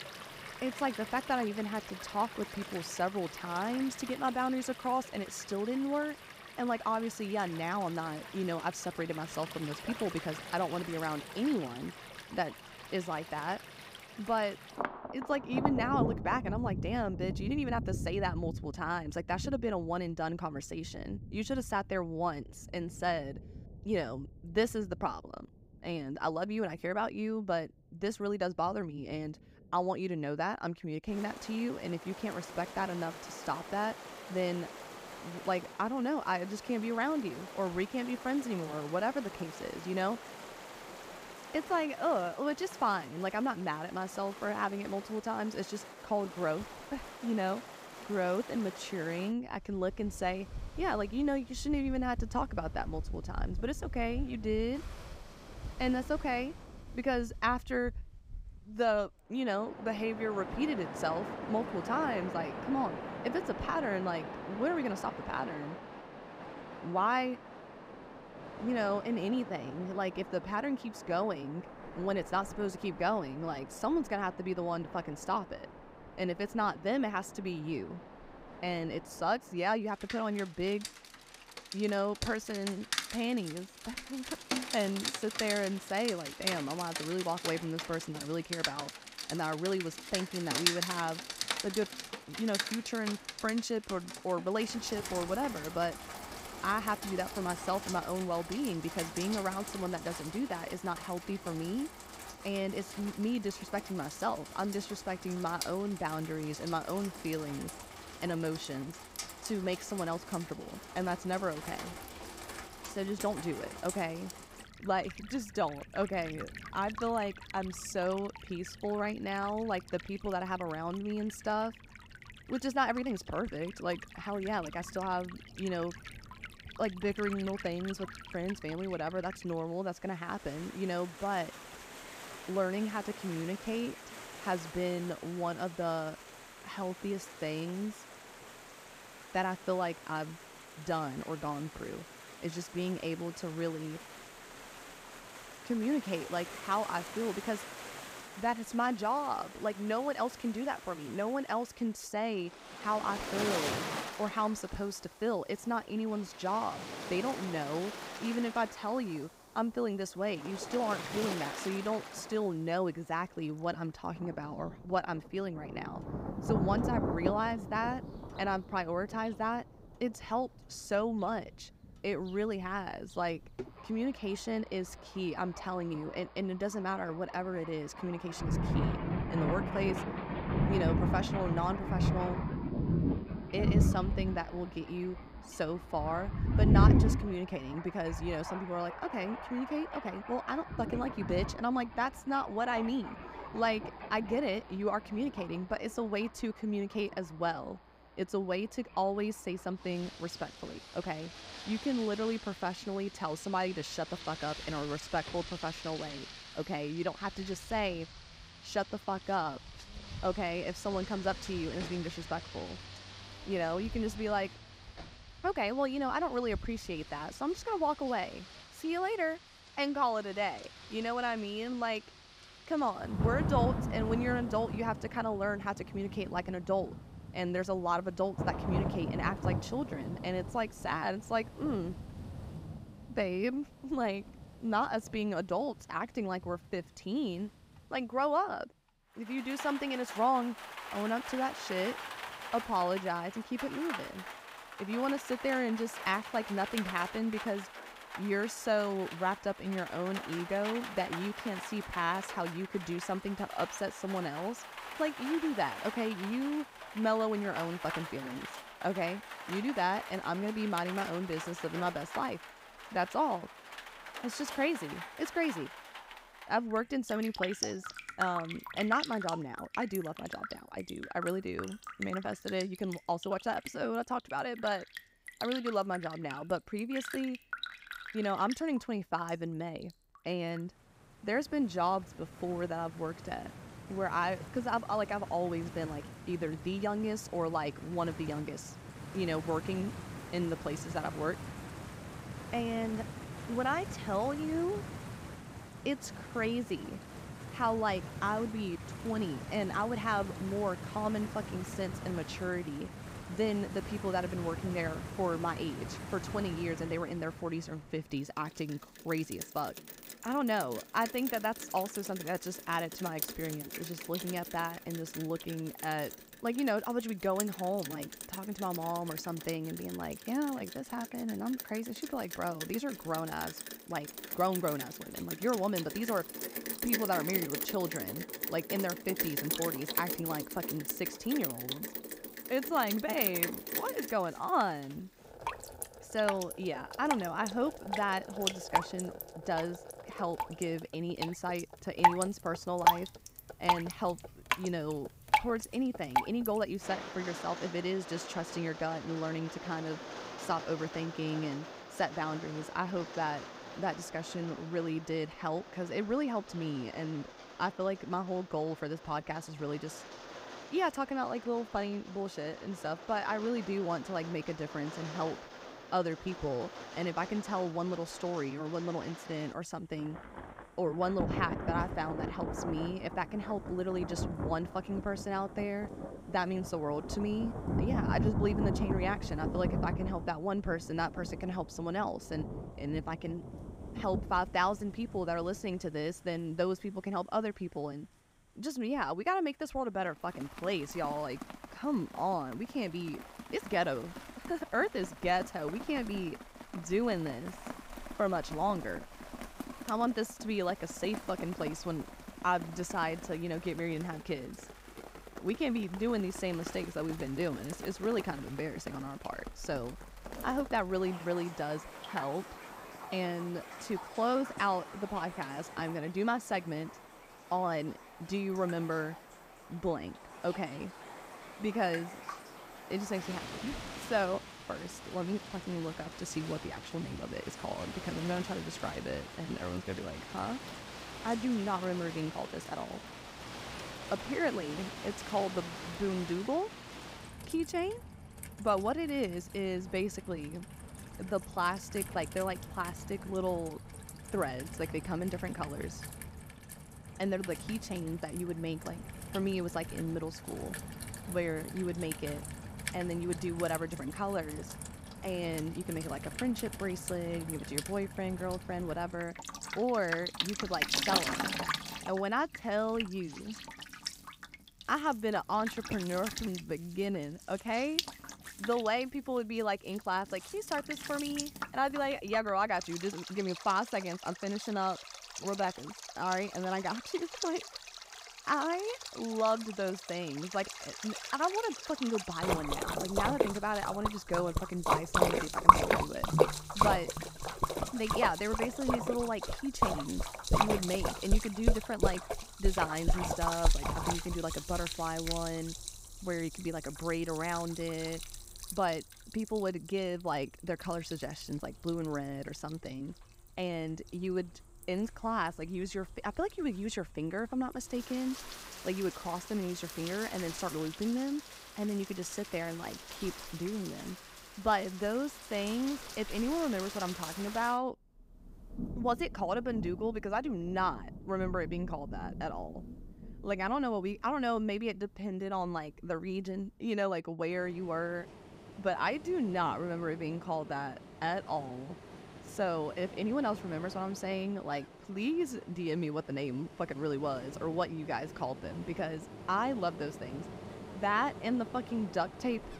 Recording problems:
rain or running water; loud; throughout; 5 dB below the speech

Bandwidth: 15.5 kHz